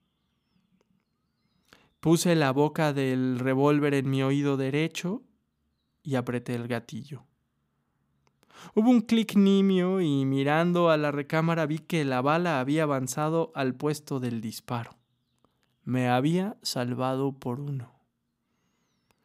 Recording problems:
none

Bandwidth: 15.5 kHz